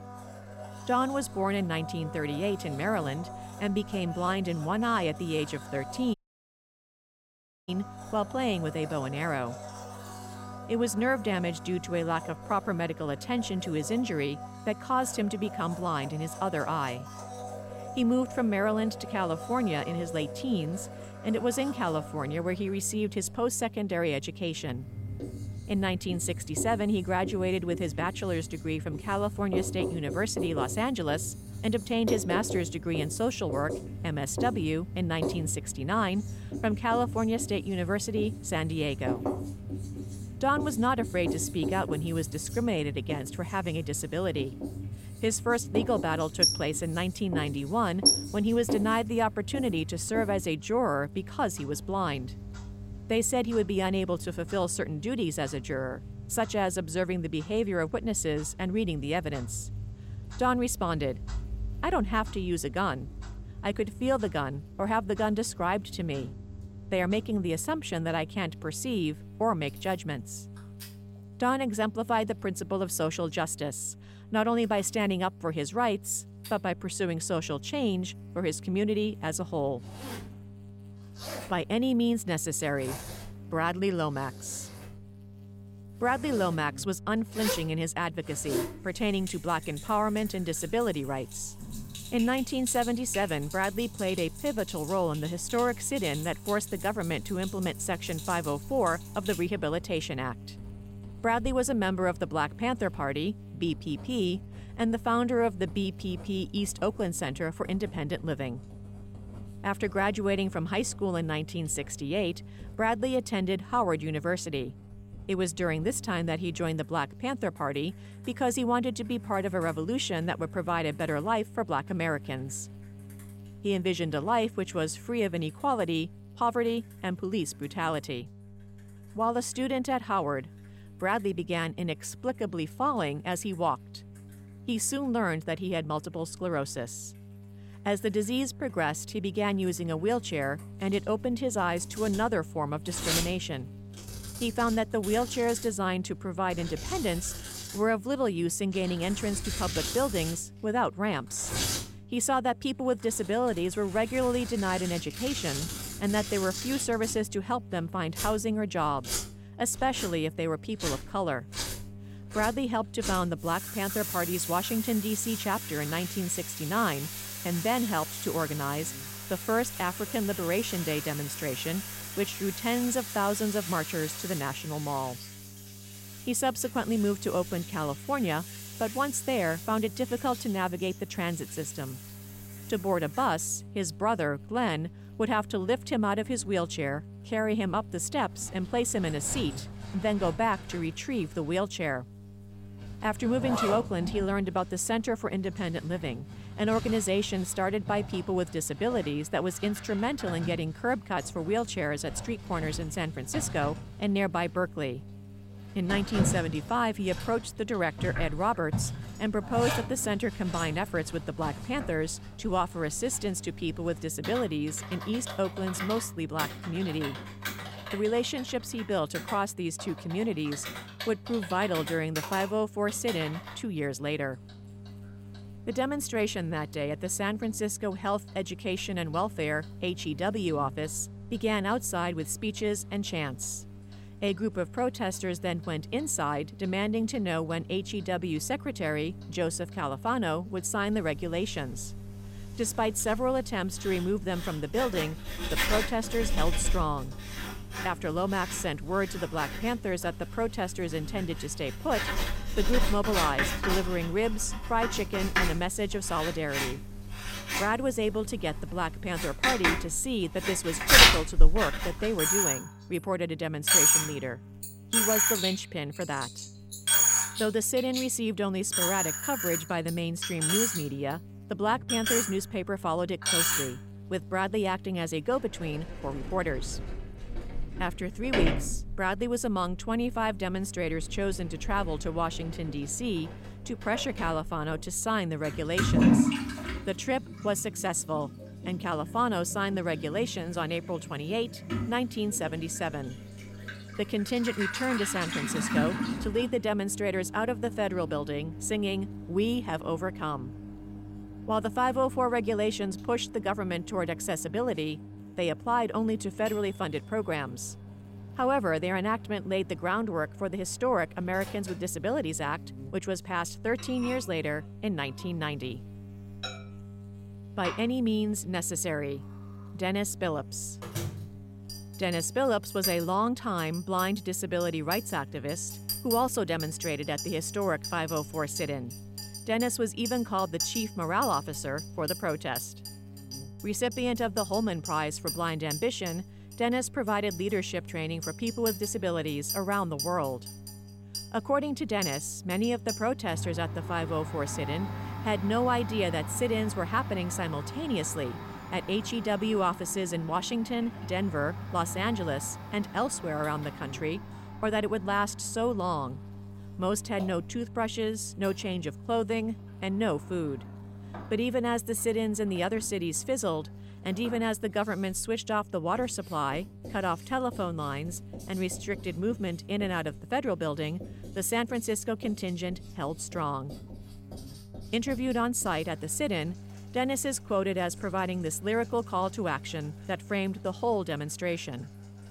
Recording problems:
household noises; loud; throughout; 4 dB below the speech
electrical hum; faint; throughout; 50 Hz, 25 dB below the speech
audio cutting out; at 6 s for 1.5 s

